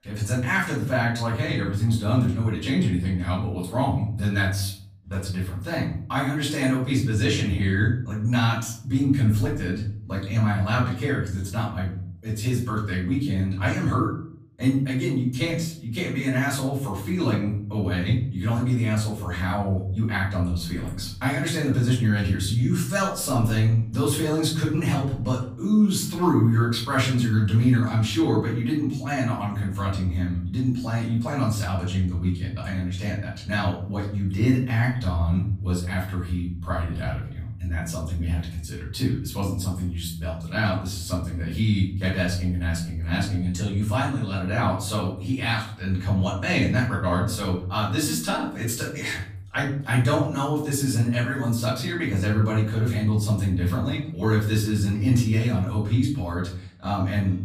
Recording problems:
off-mic speech; far
room echo; noticeable; dies away in 0.6 s

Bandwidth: 15 kHz